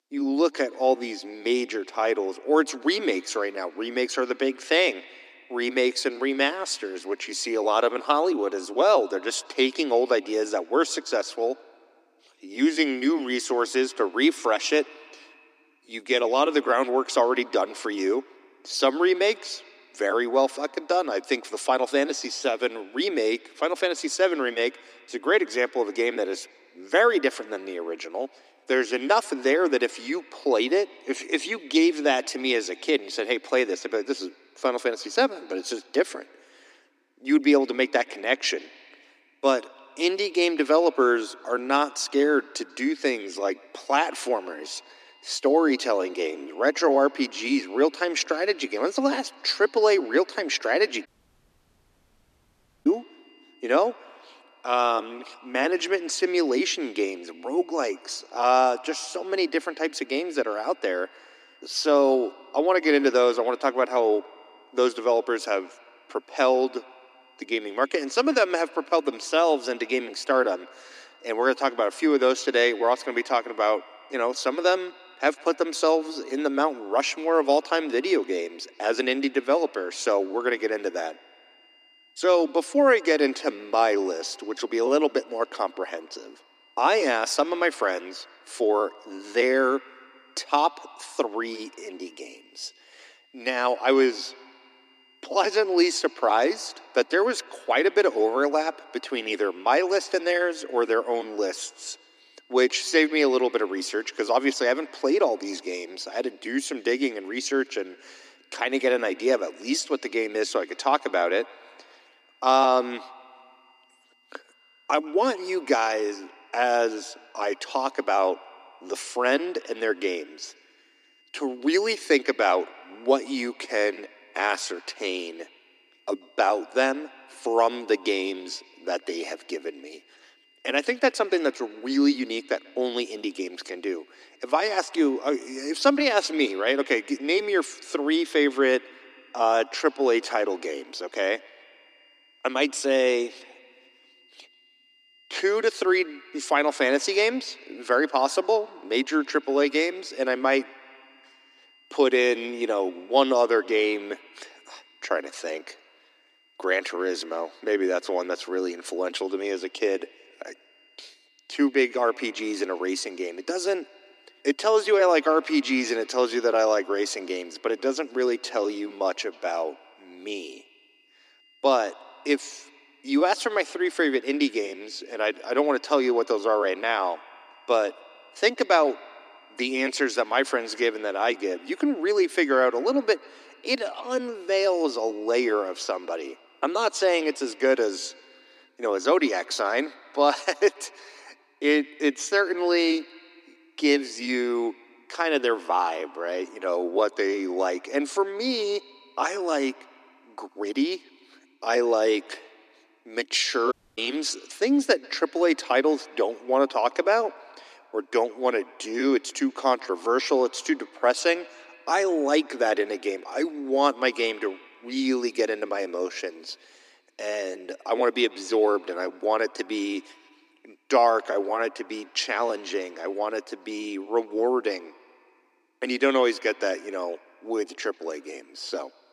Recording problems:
thin; somewhat; fading below 250 Hz
echo of what is said; faint; throughout; 140 ms later, 25 dB below the speech
high-pitched whine; faint; from 44 s to 3:09; 3 kHz, 35 dB below the speech
audio cutting out; at 51 s for 2 s and at 3:24

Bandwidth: 14 kHz